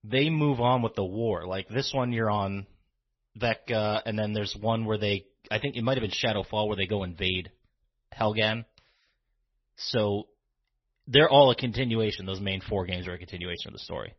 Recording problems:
garbled, watery; slightly; nothing above 6 kHz

